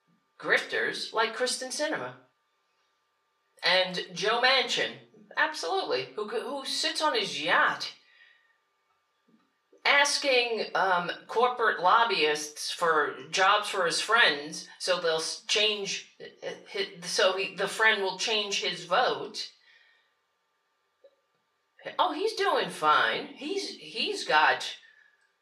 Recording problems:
off-mic speech; far
thin; very; fading below 600 Hz
room echo; slight; dies away in 0.3 s

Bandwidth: 14.5 kHz